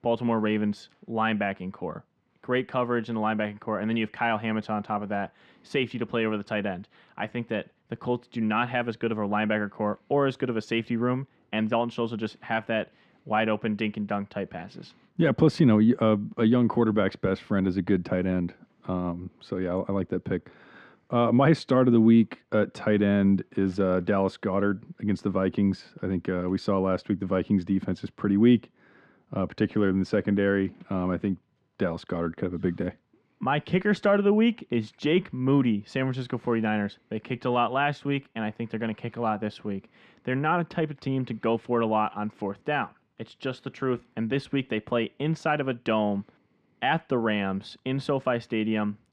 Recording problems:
muffled; slightly; fading above 3 kHz

